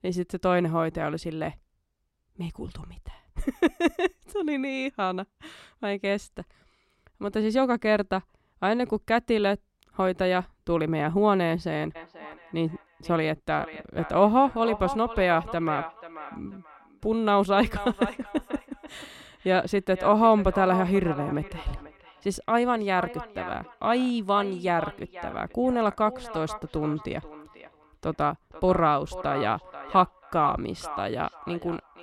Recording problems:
echo of what is said; noticeable; from 12 s on; 490 ms later, 15 dB below the speech

